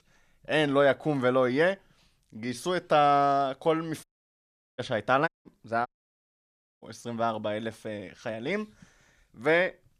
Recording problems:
audio cutting out; at 4 s for 0.5 s, at 5.5 s and at 6 s for 1 s

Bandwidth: 14.5 kHz